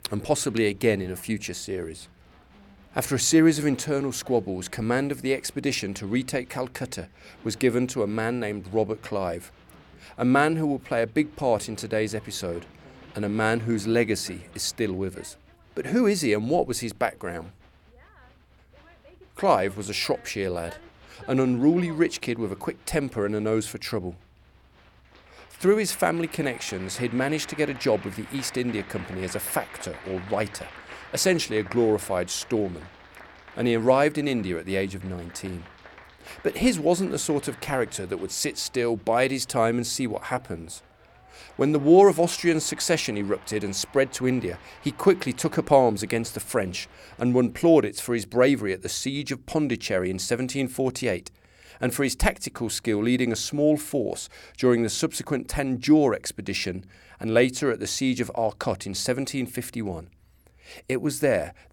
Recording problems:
crowd noise; faint; until 47 s; 20 dB below the speech

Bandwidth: 18.5 kHz